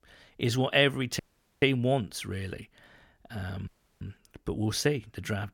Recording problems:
audio cutting out; at 1 s and at 3.5 s

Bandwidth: 17 kHz